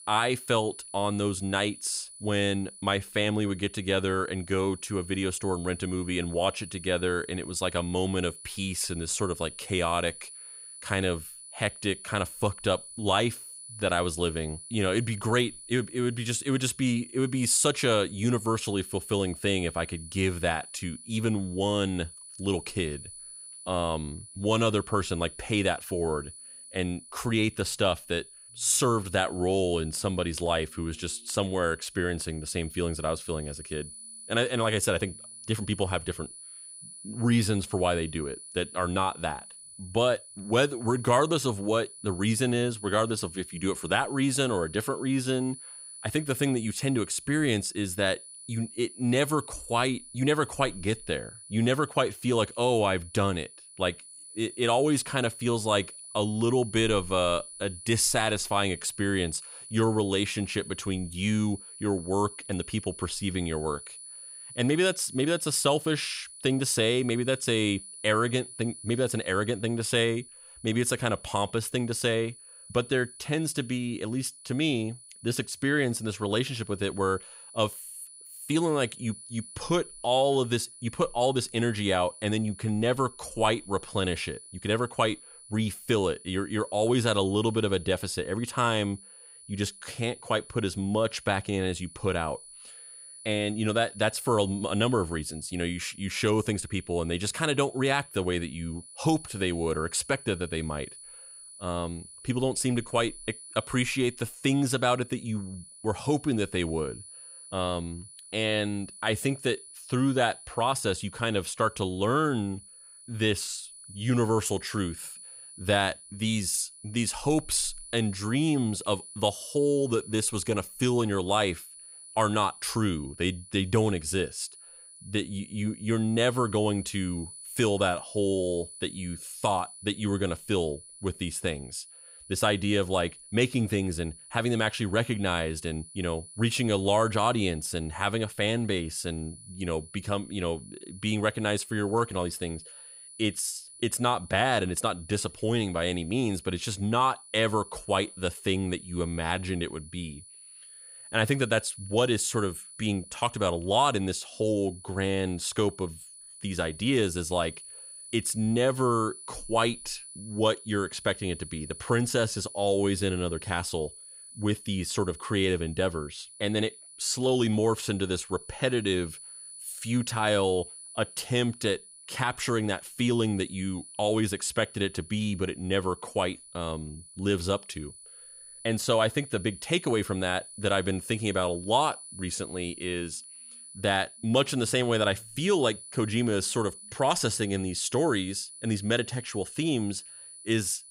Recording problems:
high-pitched whine; noticeable; throughout; 10 kHz, 15 dB below the speech

